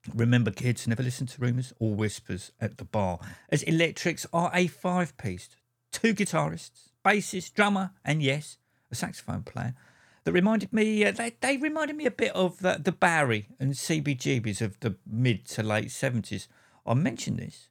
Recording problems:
uneven, jittery; strongly; from 1 to 15 s

